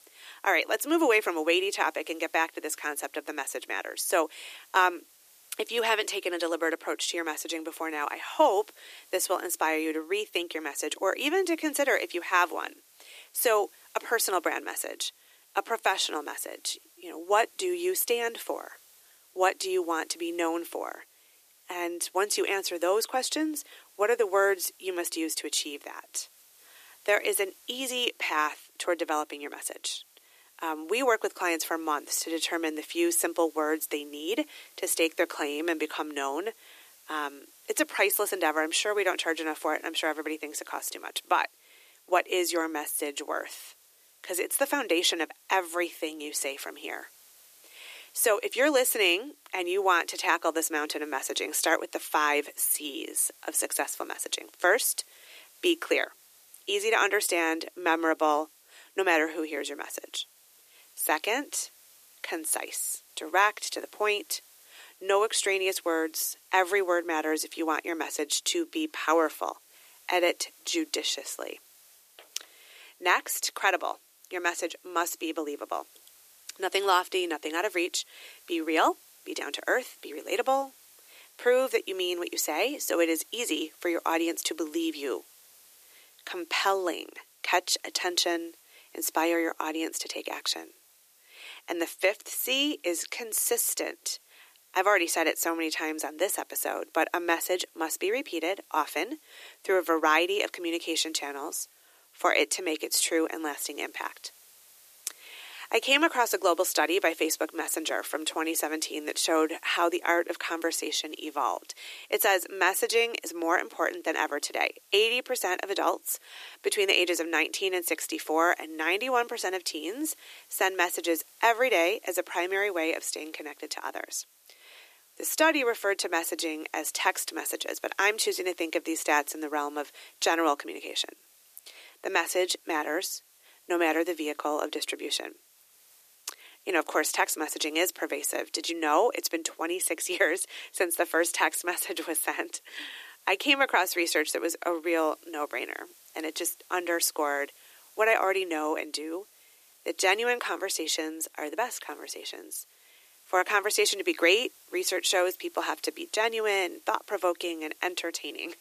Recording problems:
thin; very; fading below 300 Hz
hiss; faint; throughout; 25 dB below the speech

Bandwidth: 14.5 kHz